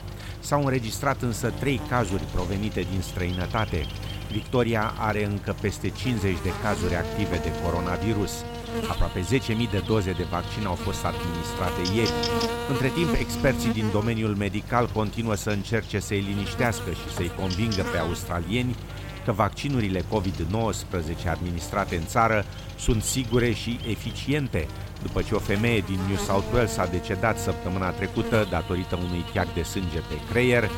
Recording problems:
electrical hum; loud; throughout; 50 Hz, 7 dB below the speech

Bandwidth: 16.5 kHz